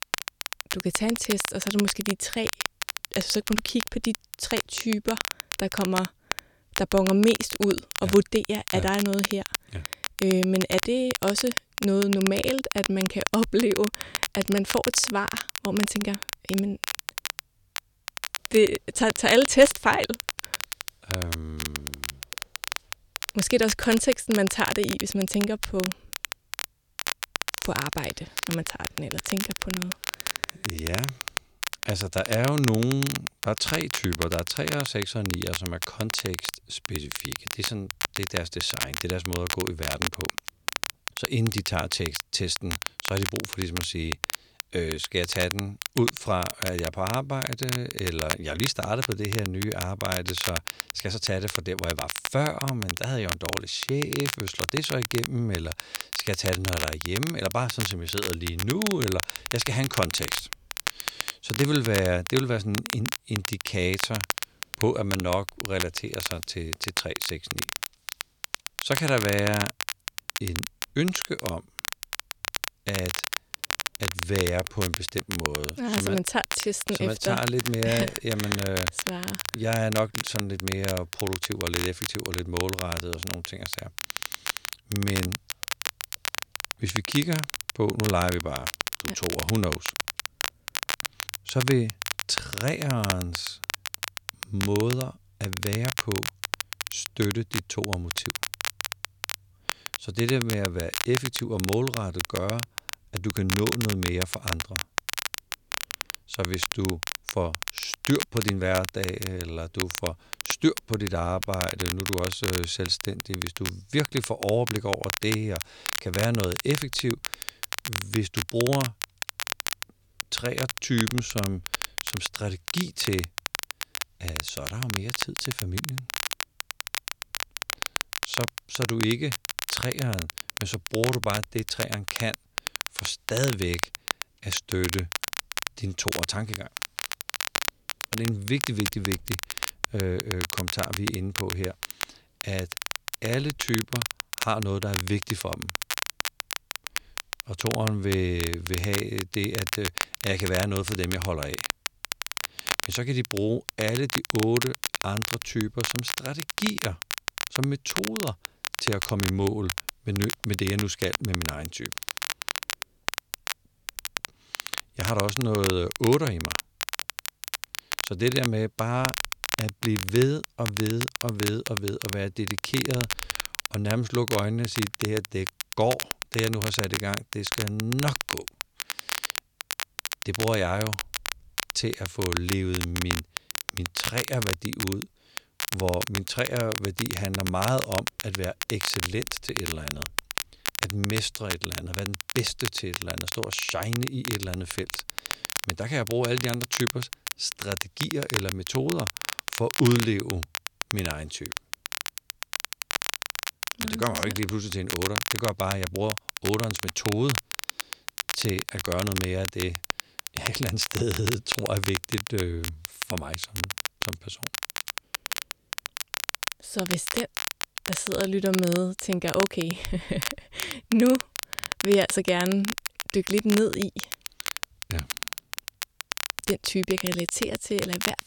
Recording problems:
crackle, like an old record; loud; 3 dB below the speech

